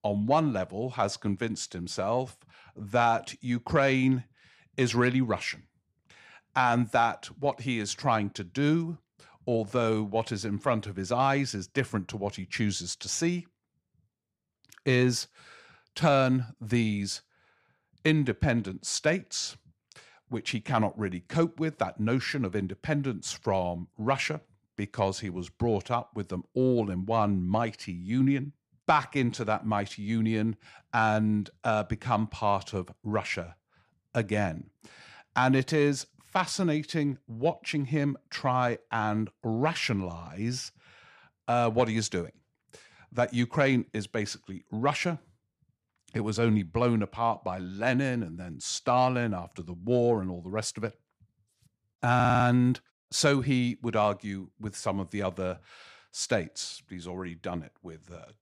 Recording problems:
audio stuttering; at 52 s

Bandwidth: 14.5 kHz